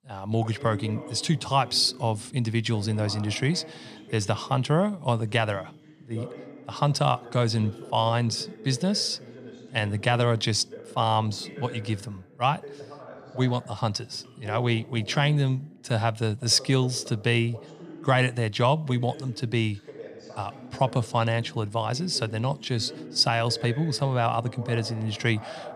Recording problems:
voice in the background; noticeable; throughout; 15 dB below the speech

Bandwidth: 15 kHz